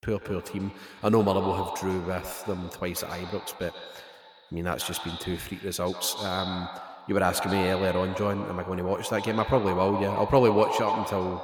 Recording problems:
echo of what is said; strong; throughout; 140 ms later, 7 dB below the speech

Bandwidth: 18.5 kHz